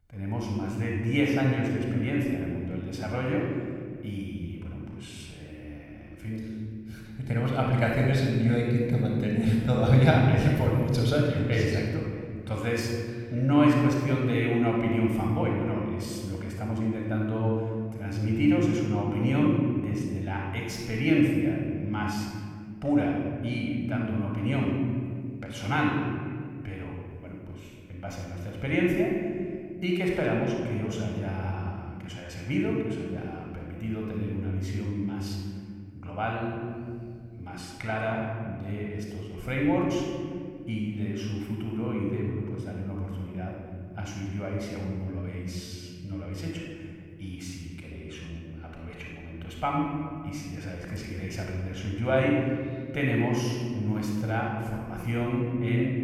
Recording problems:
room echo; noticeable; dies away in 2.1 s
off-mic speech; somewhat distant

